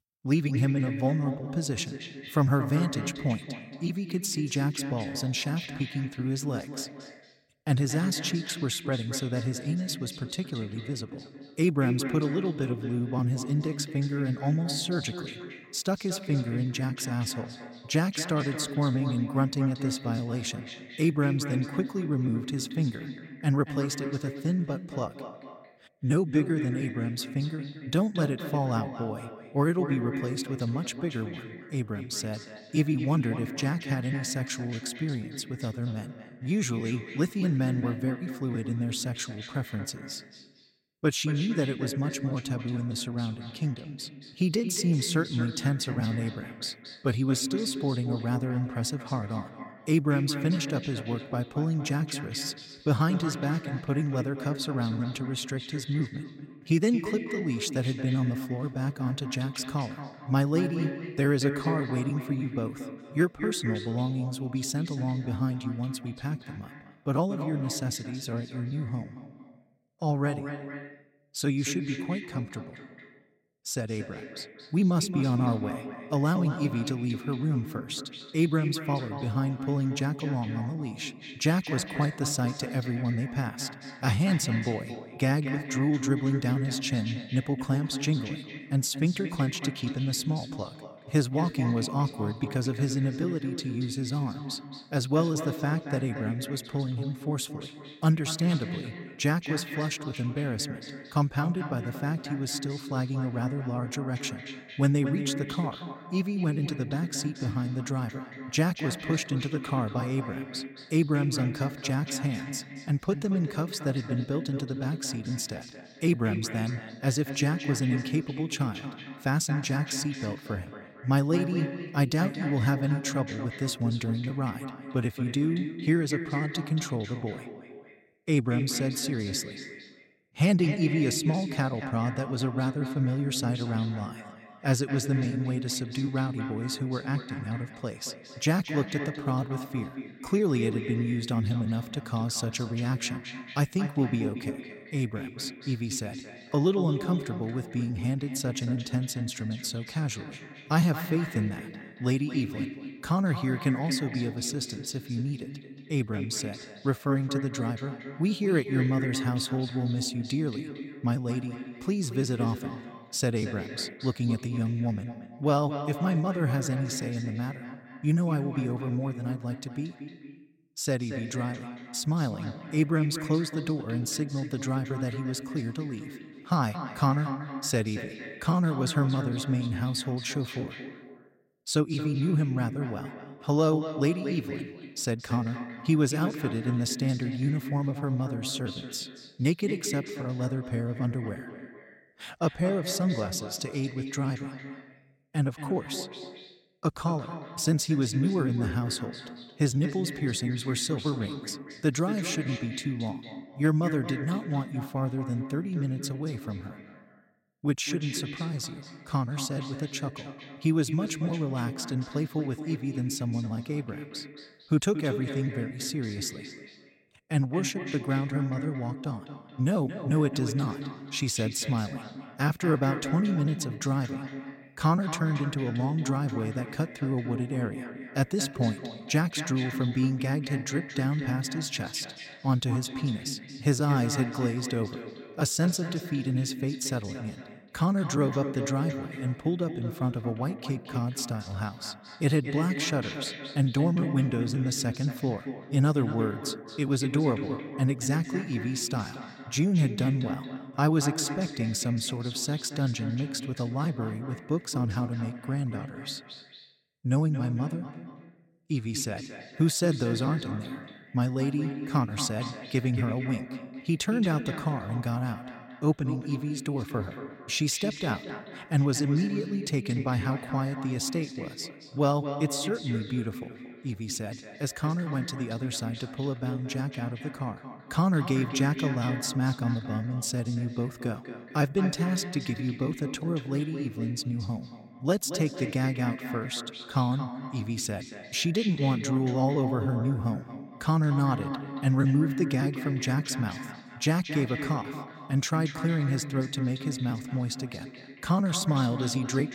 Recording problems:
echo of what is said; strong; throughout; 230 ms later, 9 dB below the speech

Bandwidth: 16 kHz